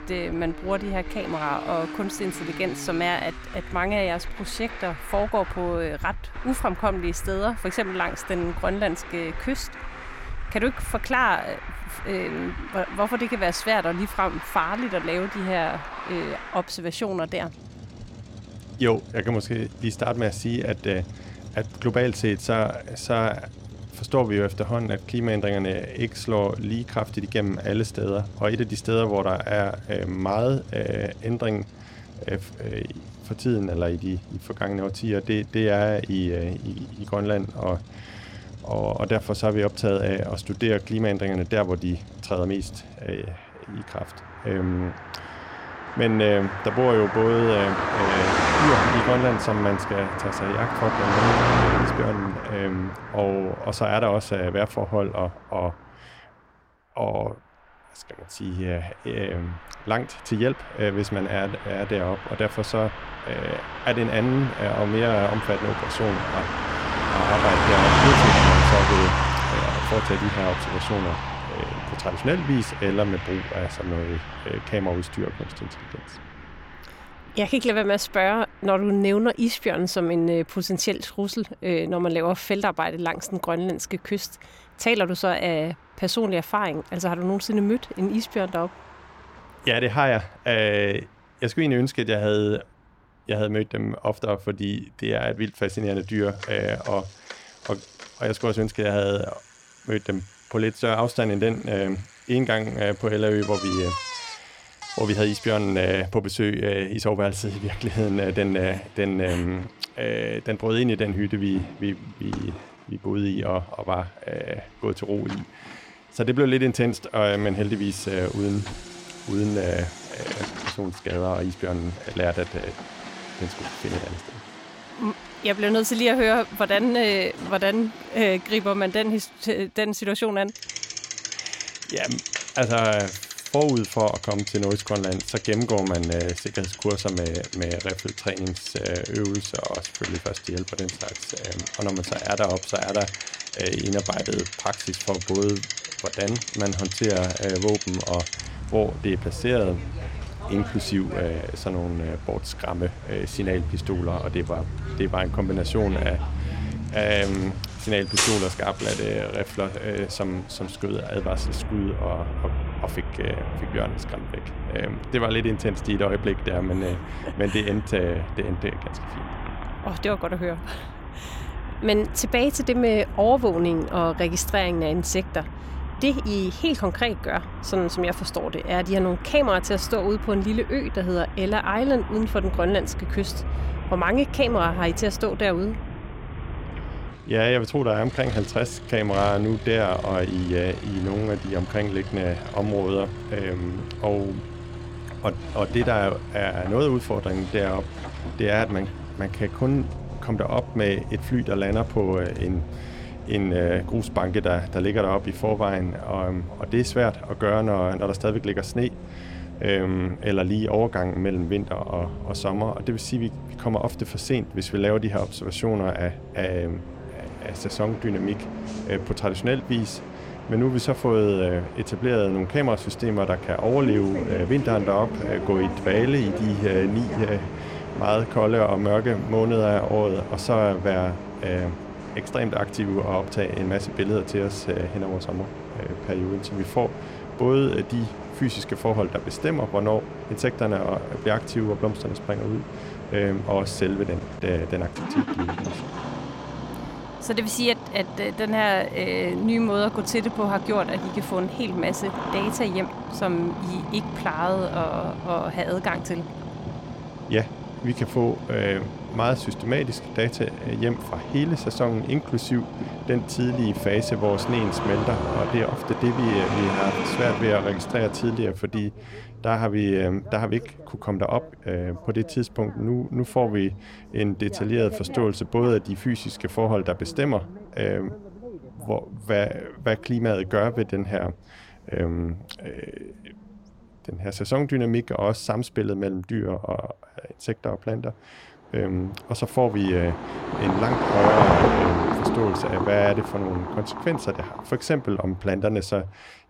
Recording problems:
traffic noise; loud; throughout; 6 dB below the speech

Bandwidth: 16.5 kHz